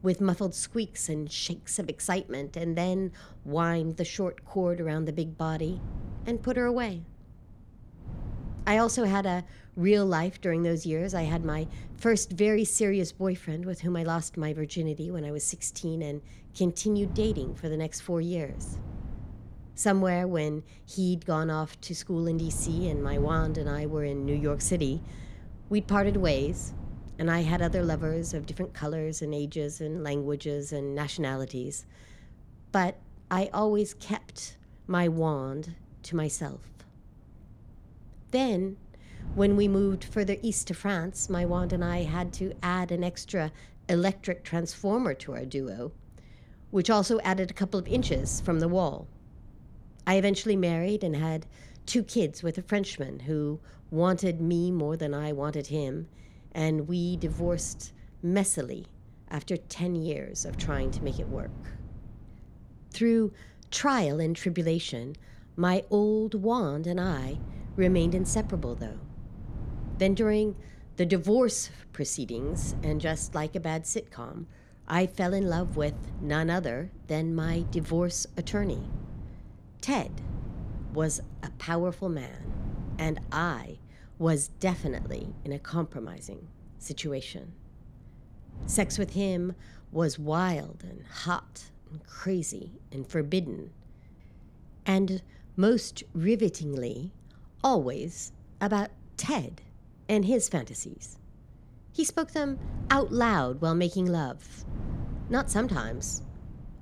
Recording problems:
wind noise on the microphone; occasional gusts; 20 dB below the speech

